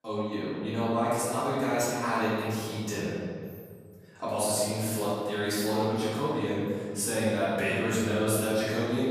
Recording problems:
room echo; strong; dies away in 2 s
off-mic speech; far

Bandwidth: 15 kHz